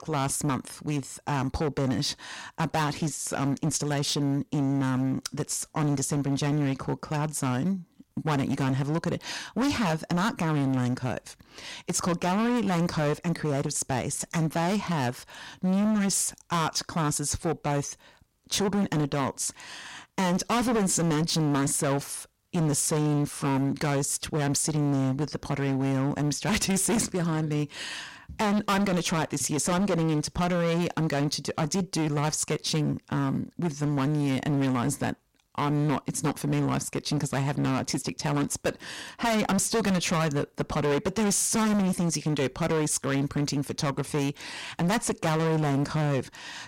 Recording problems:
distortion; heavy; 19% of the sound clipped

